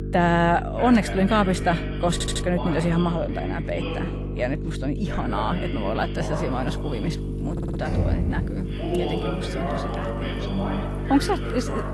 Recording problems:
garbled, watery; slightly; nothing above 11.5 kHz
voice in the background; loud; throughout; 8 dB below the speech
electrical hum; noticeable; throughout; 50 Hz, 10 dB below the speech
rain or running water; noticeable; throughout; 20 dB below the speech
audio stuttering; at 2 s and at 7.5 s
door banging; loud; at 8 s; peak 1 dB above the speech

